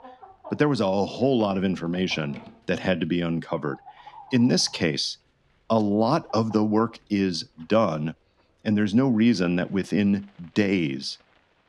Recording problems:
animal sounds; faint; throughout; 25 dB below the speech

